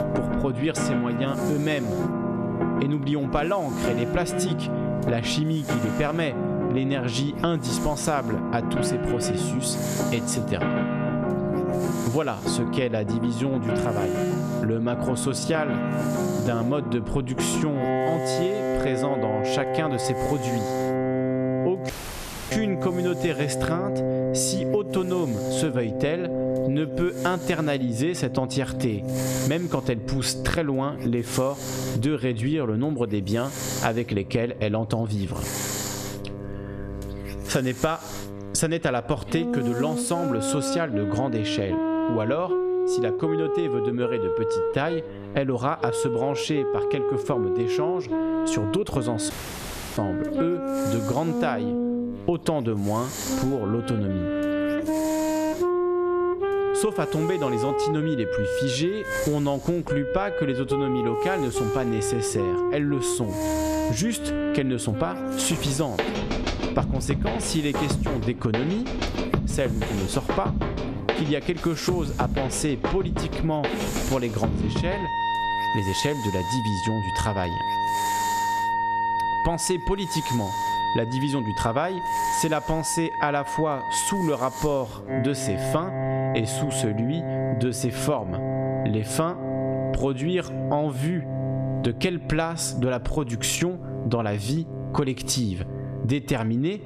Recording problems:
squashed, flat; somewhat, background pumping
background music; loud; throughout; 1 dB below the speech
hiss; noticeable; until 41 s and from 49 s to 1:26; 10 dB below the speech
electrical hum; faint; throughout; 50 Hz, 20 dB below the speech
audio cutting out; at 22 s for 0.5 s and at 49 s for 0.5 s

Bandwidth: 14 kHz